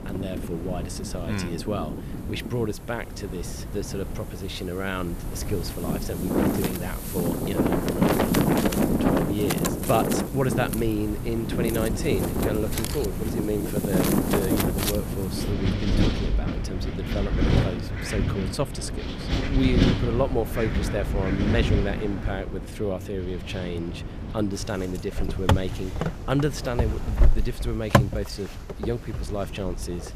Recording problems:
wind in the background; very loud; throughout; 3 dB above the speech

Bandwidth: 14.5 kHz